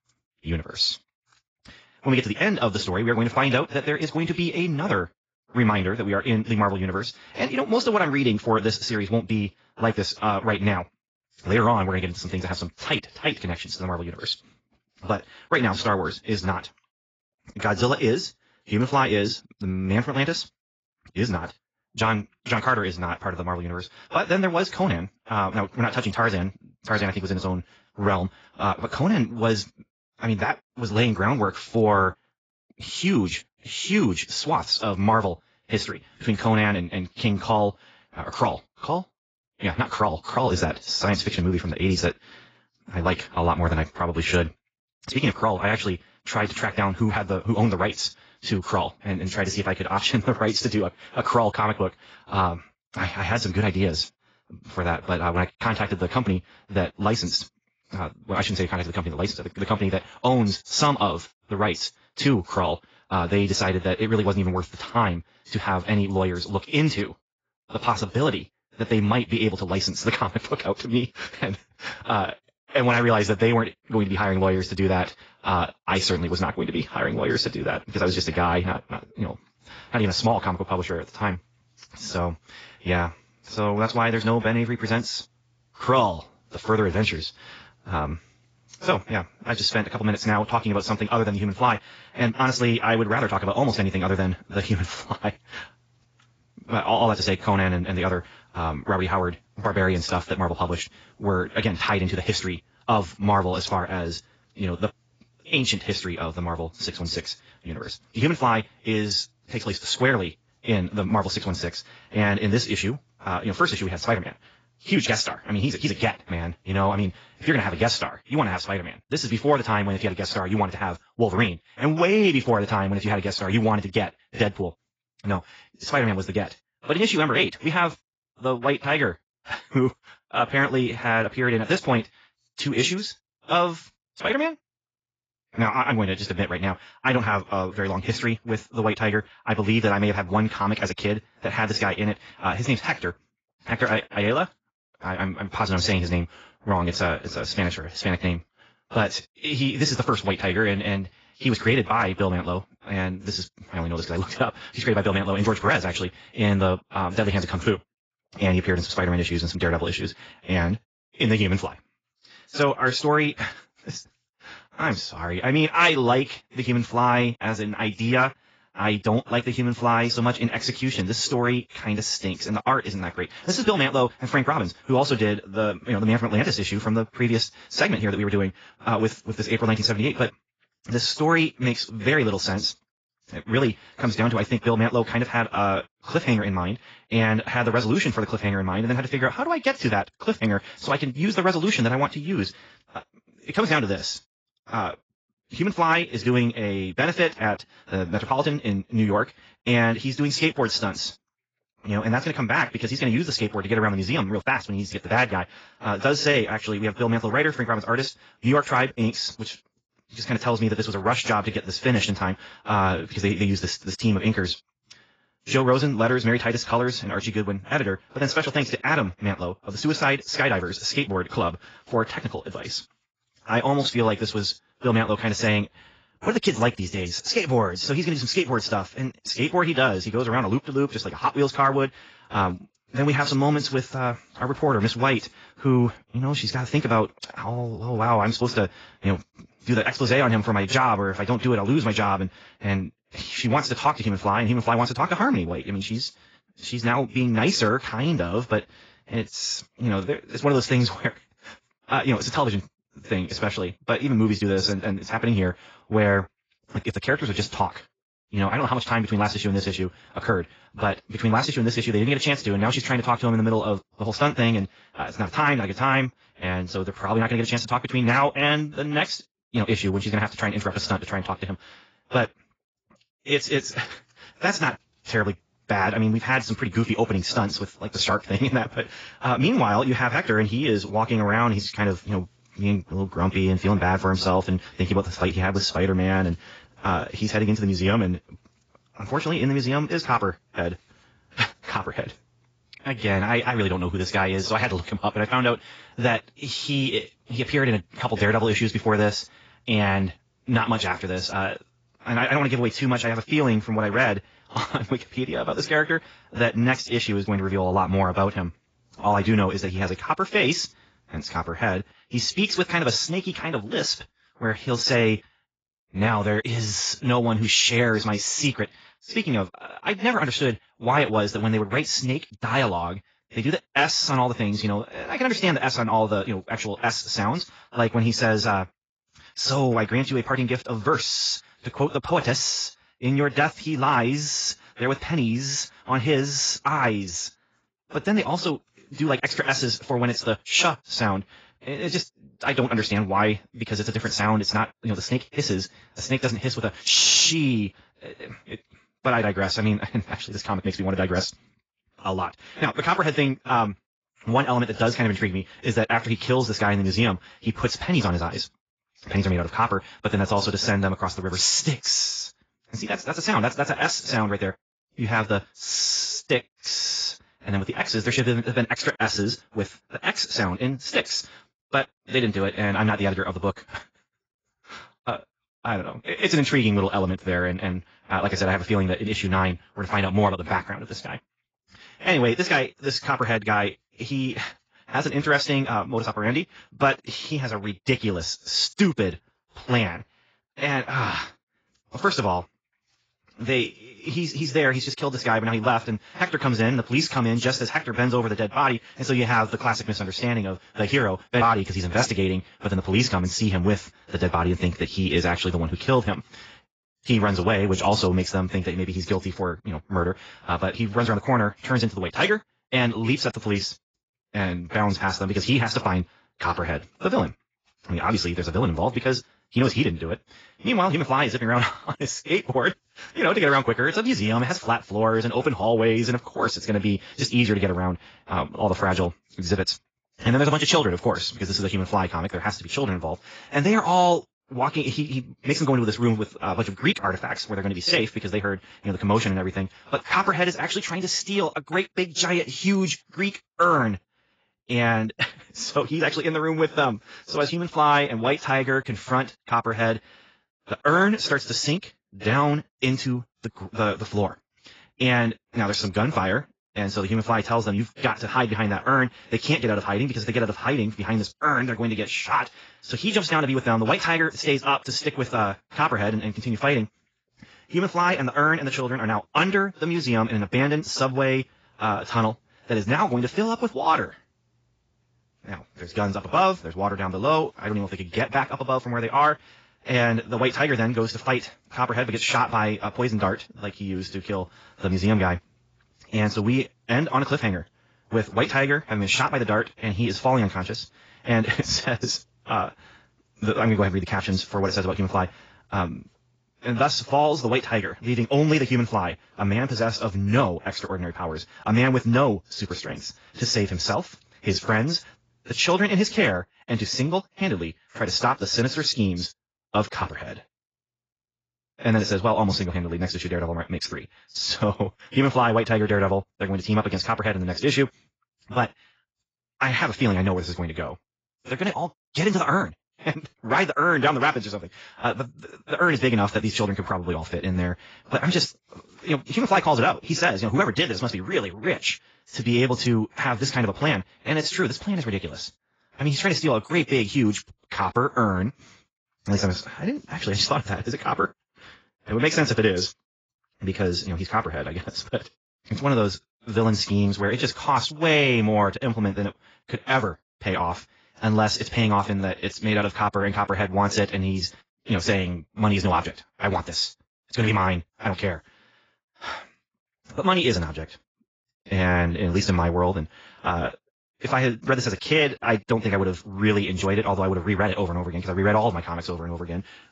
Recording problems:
garbled, watery; badly; nothing above 7.5 kHz
wrong speed, natural pitch; too fast; 1.5 times normal speed

